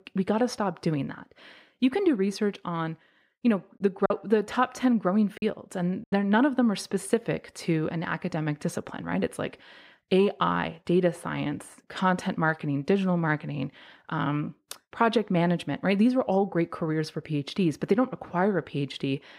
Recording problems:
choppy; very; from 4 to 6 s; 6% of the speech affected

